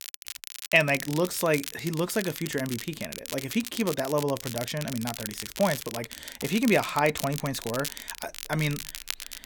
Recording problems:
crackle, like an old record; loud; 9 dB below the speech

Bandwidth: 17.5 kHz